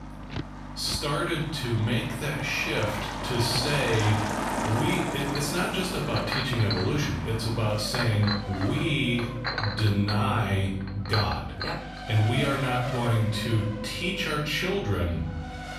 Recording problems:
off-mic speech; far
room echo; noticeable; dies away in 0.7 s
household noises; loud; until 12 s; 8 dB below the speech
traffic noise; loud; throughout; 8 dB below the speech
electrical hum; faint; throughout; 50 Hz, 20 dB below the speech

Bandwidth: 14.5 kHz